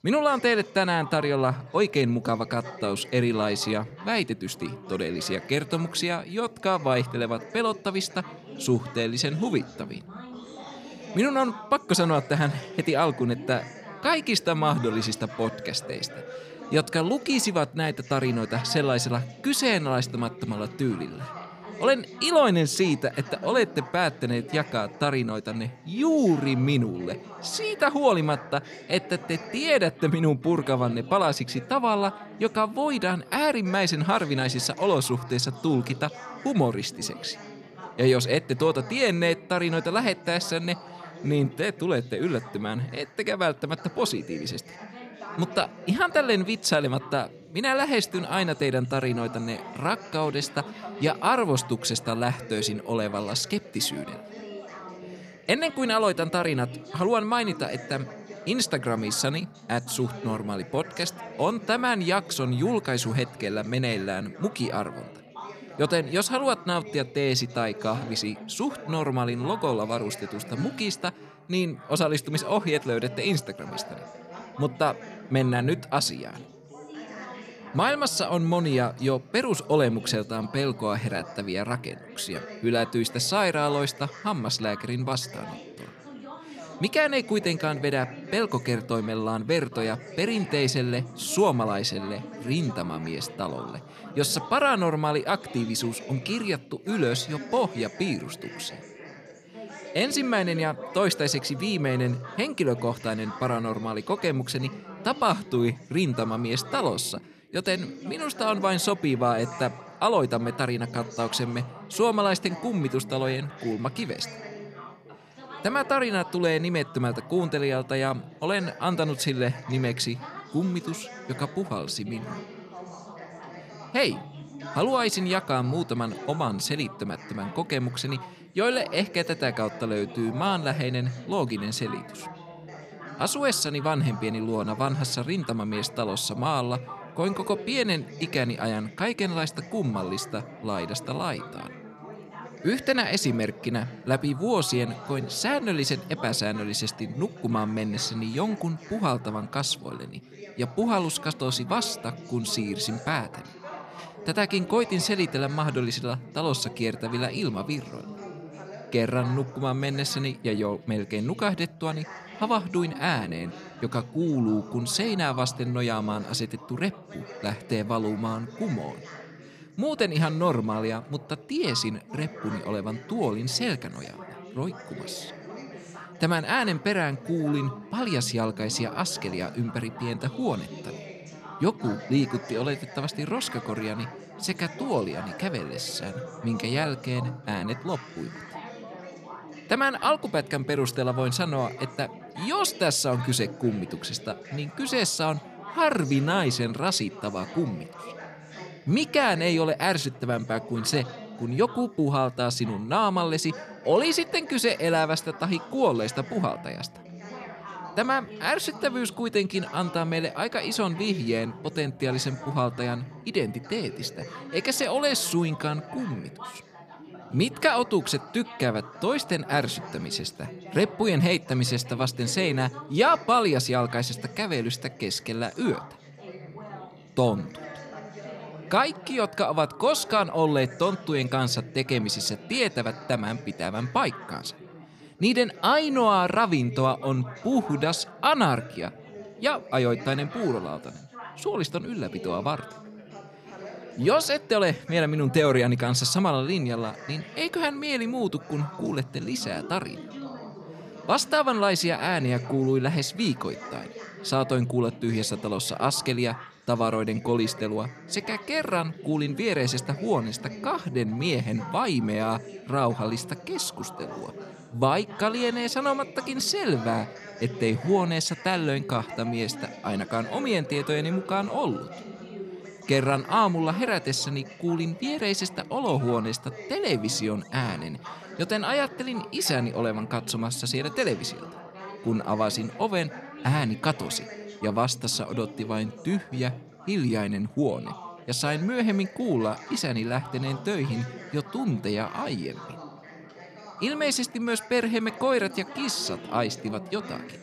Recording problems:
background chatter; noticeable; throughout; 4 voices, 15 dB below the speech

